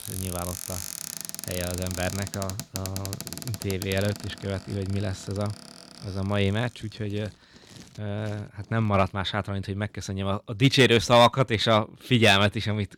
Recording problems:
household noises; noticeable; throughout; 10 dB below the speech

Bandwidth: 17.5 kHz